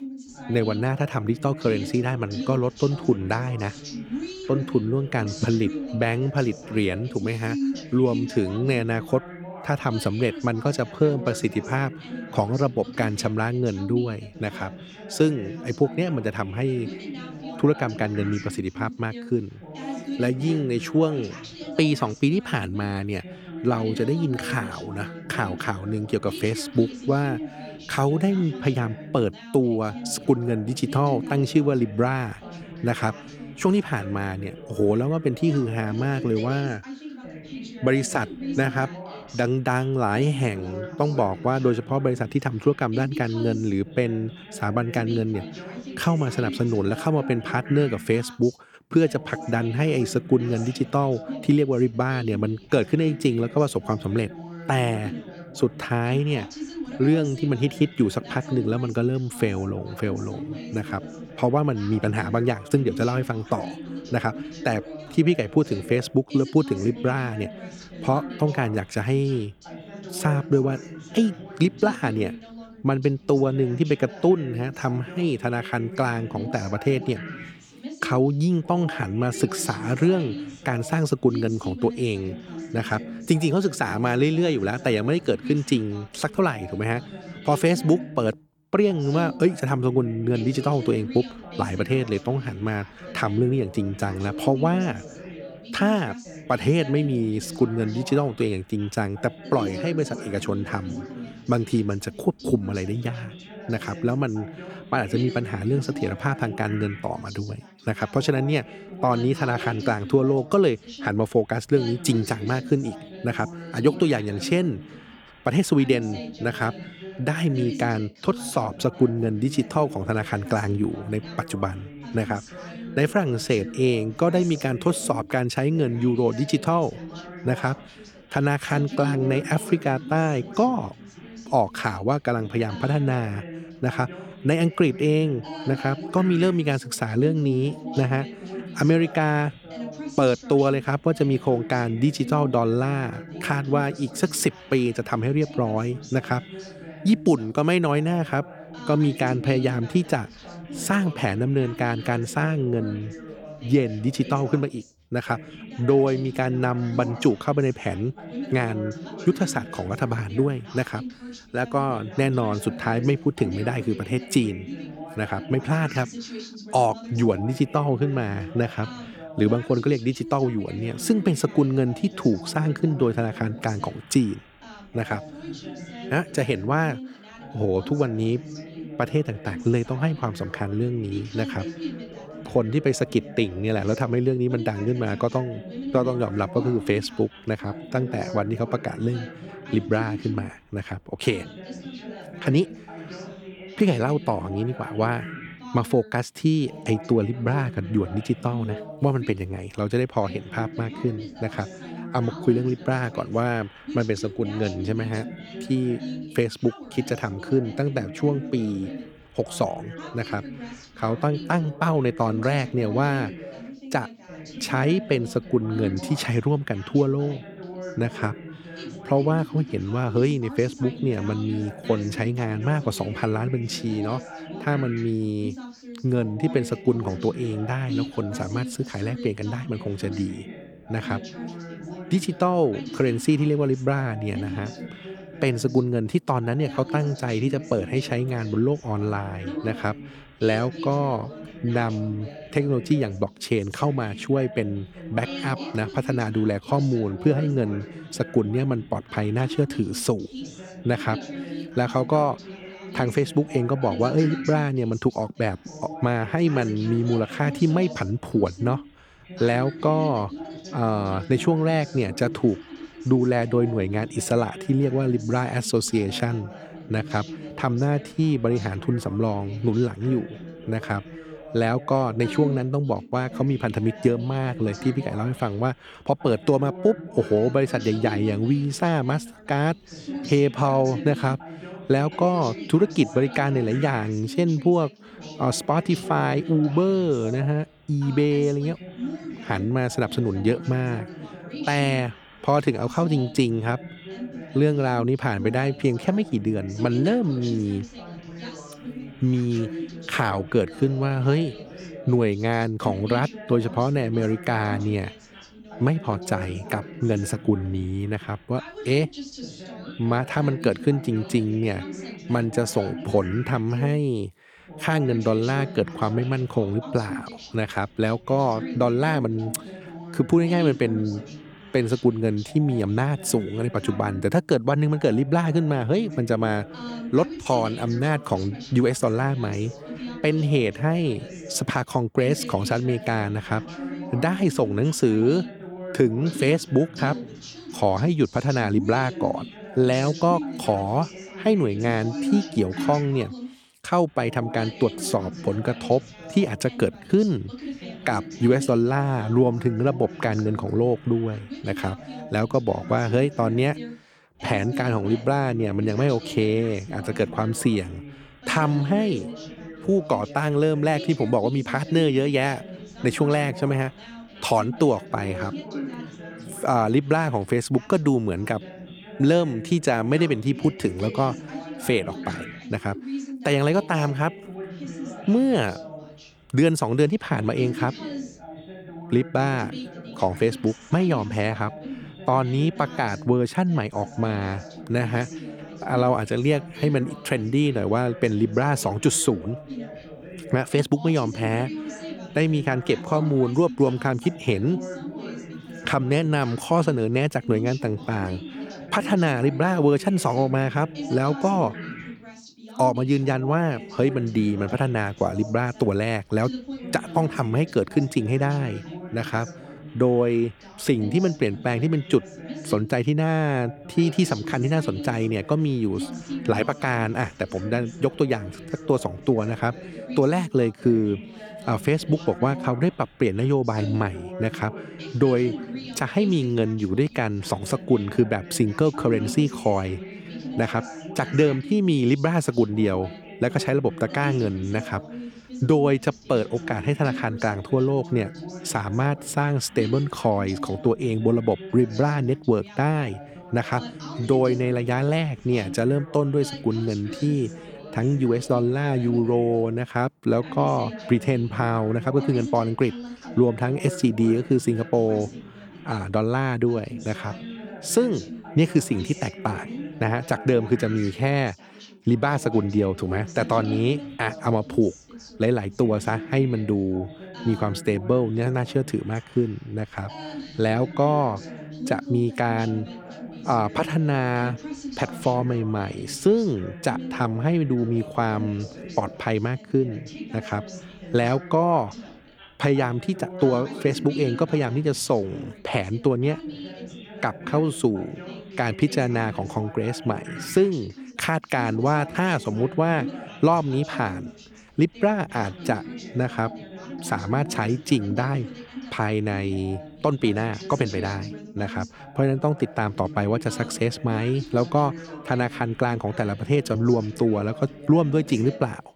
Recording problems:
background chatter; noticeable; throughout; 2 voices, 15 dB below the speech

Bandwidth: 18.5 kHz